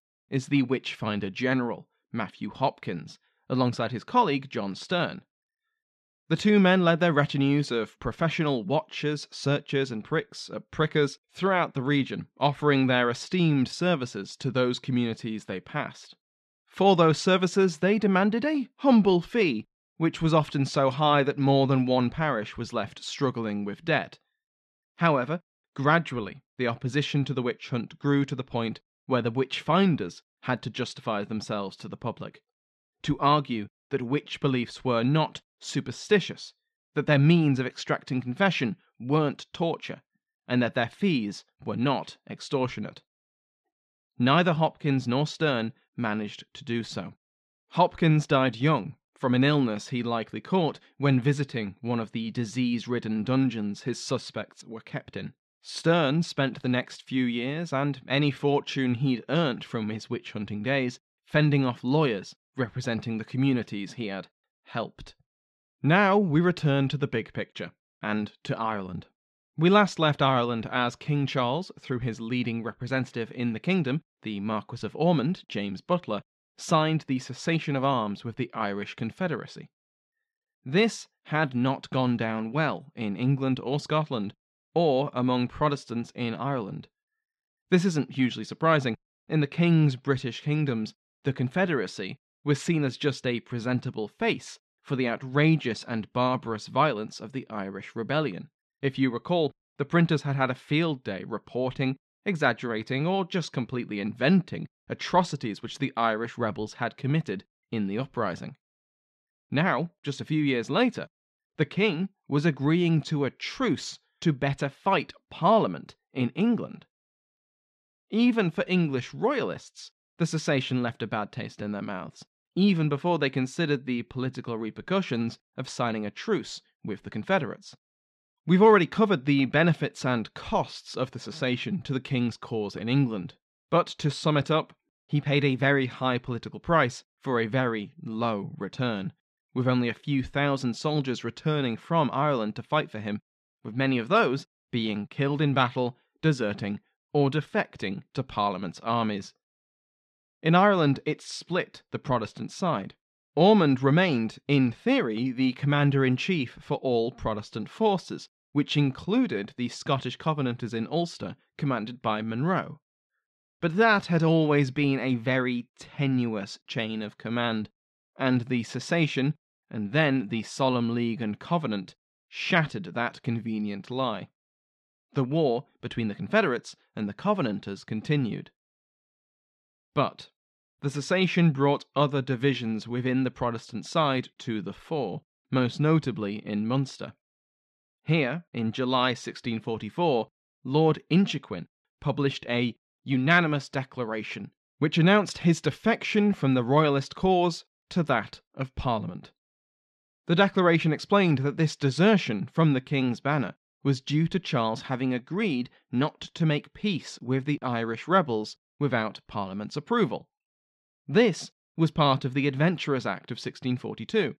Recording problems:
muffled; slightly; fading above 3.5 kHz

